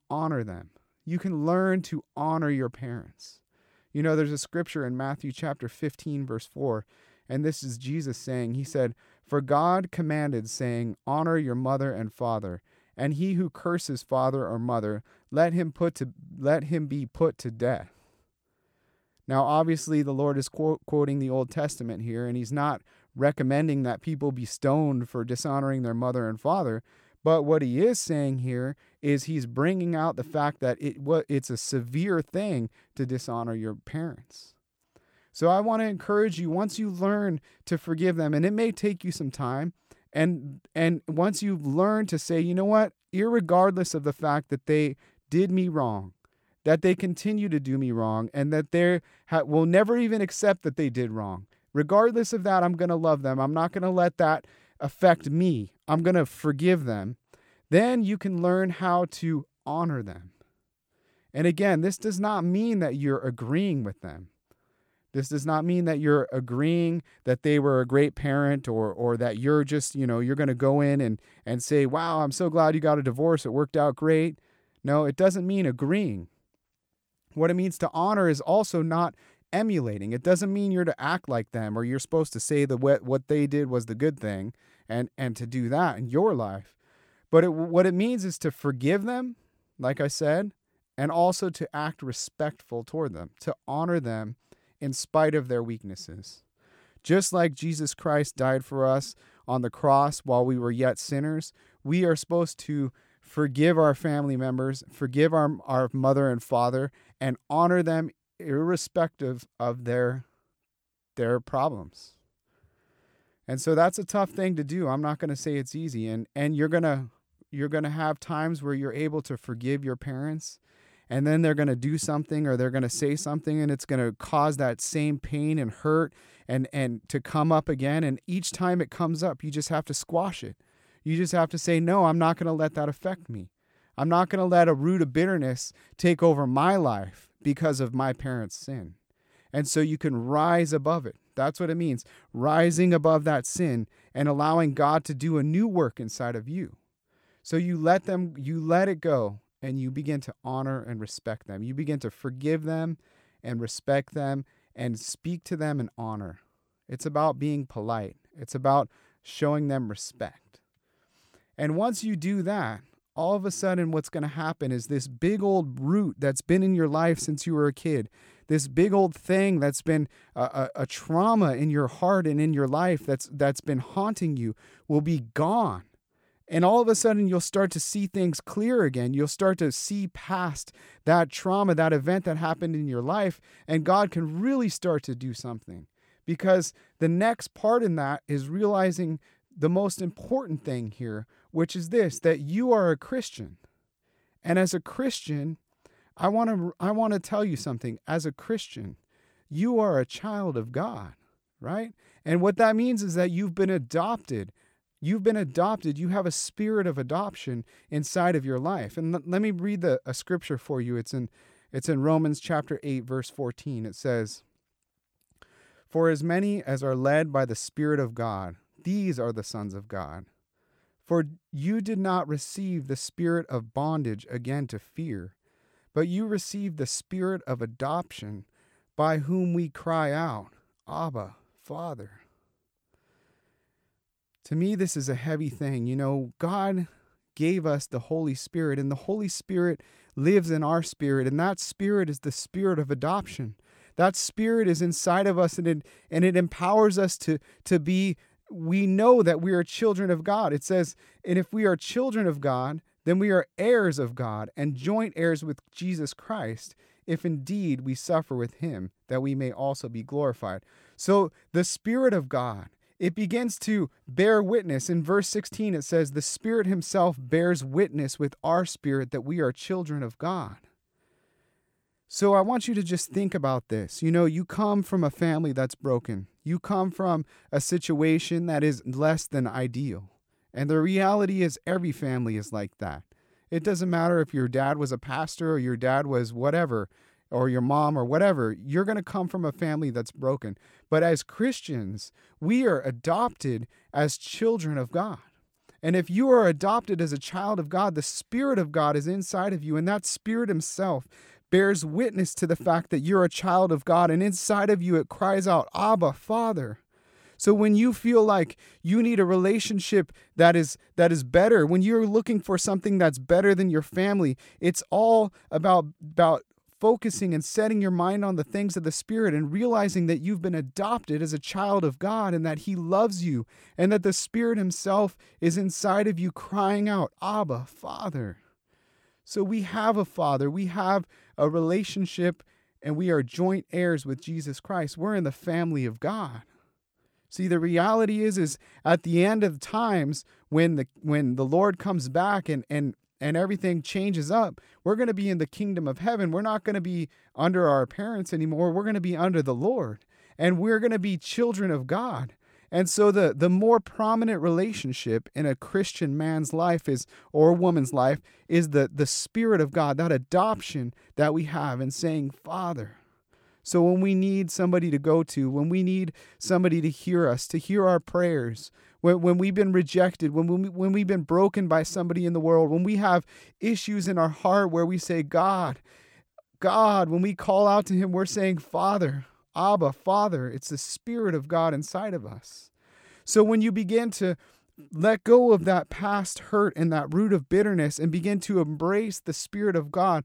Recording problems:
none

